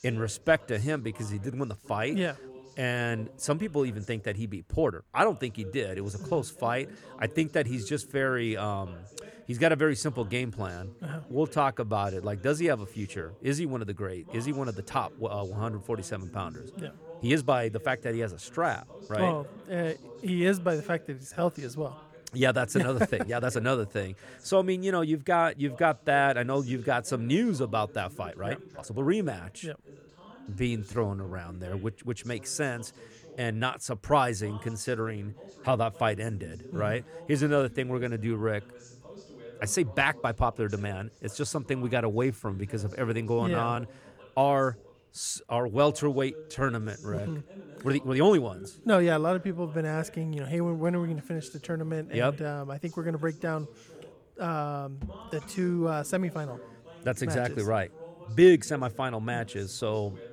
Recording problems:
voice in the background; faint; throughout; 20 dB below the speech
uneven, jittery; strongly; from 0.5 to 59 s

